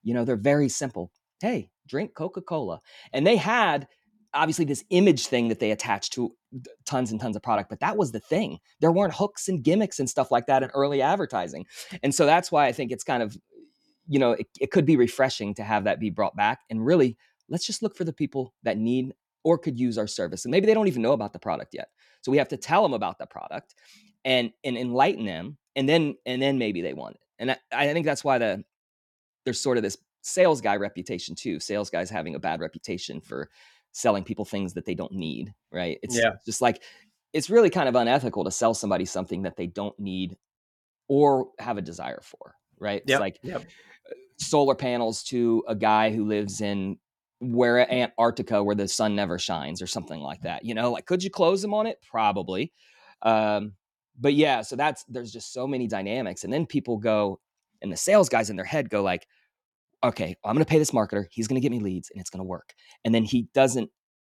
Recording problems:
none

